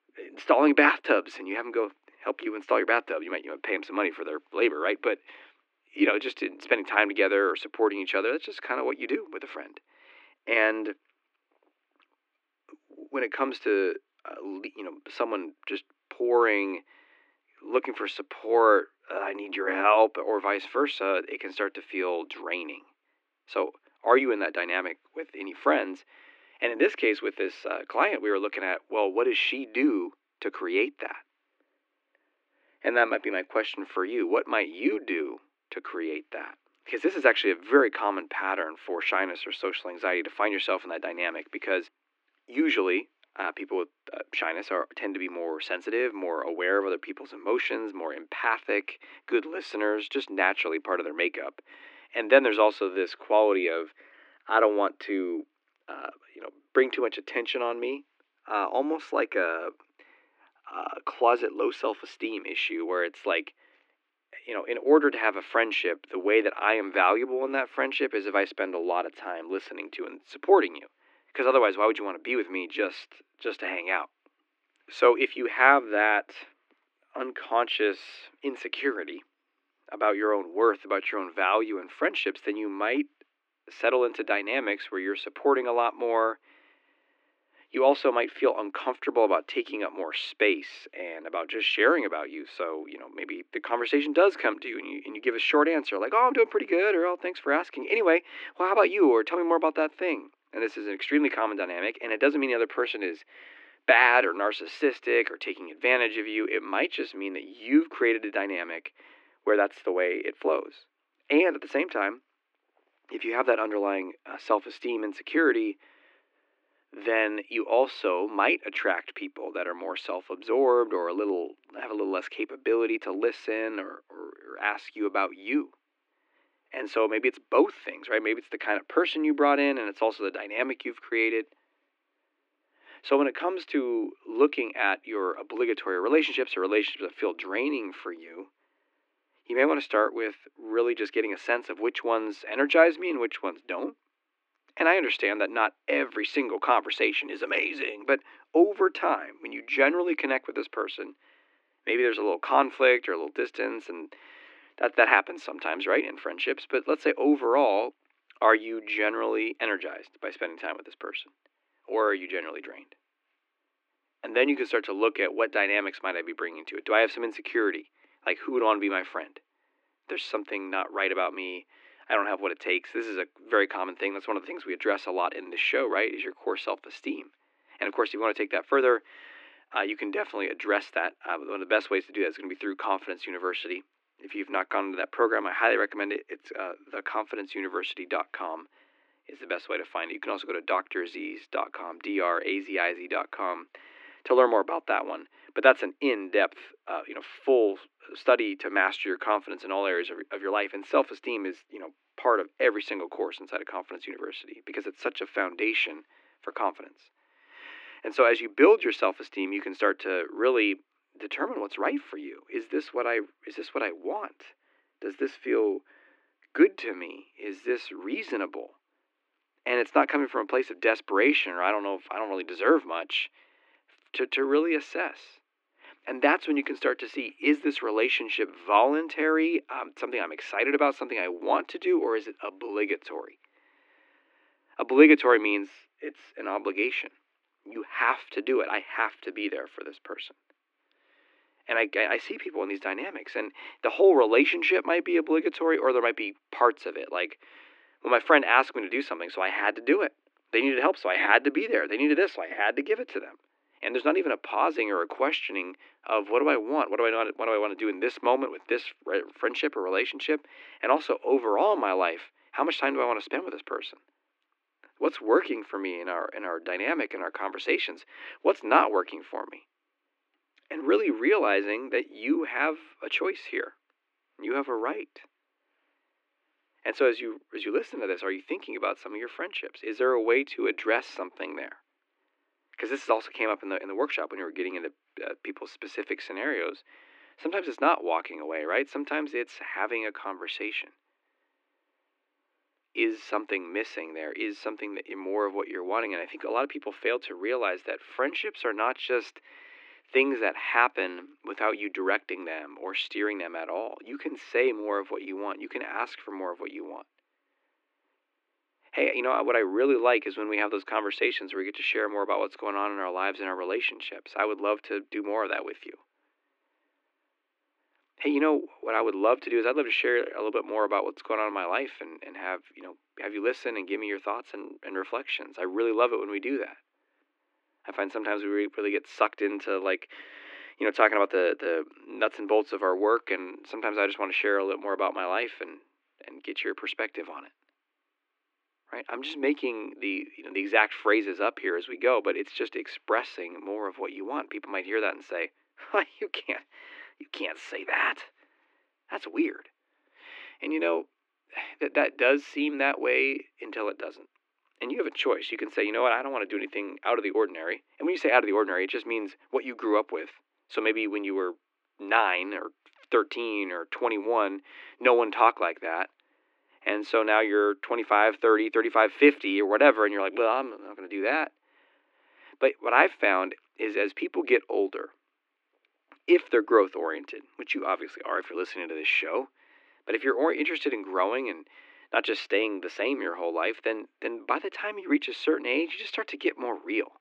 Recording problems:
muffled; slightly; fading above 2.5 kHz
thin; somewhat; fading below 300 Hz

